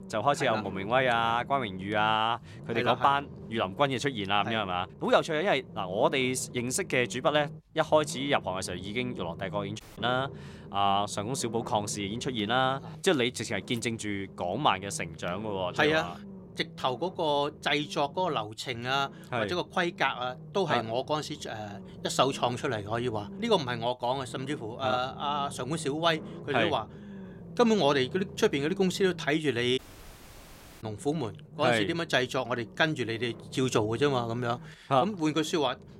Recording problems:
low rumble; faint; throughout; 20 dB below the speech
audio cutting out; at 10 s and at 30 s for 1 s

